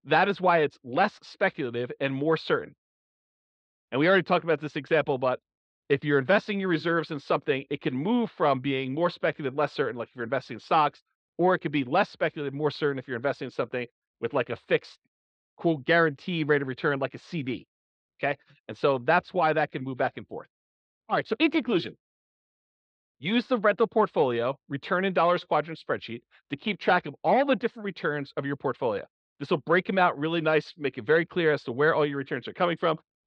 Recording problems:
muffled; slightly; fading above 4 kHz

